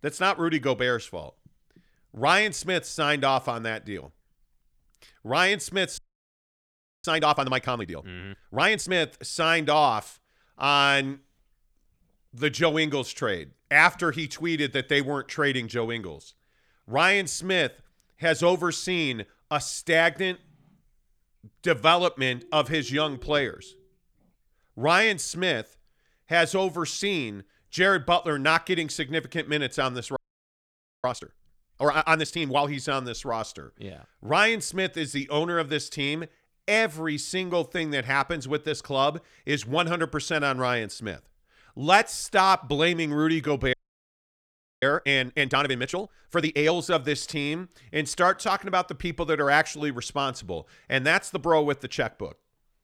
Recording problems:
audio freezing; at 6 s for 1 s, at 30 s for 1 s and at 44 s for 1 s

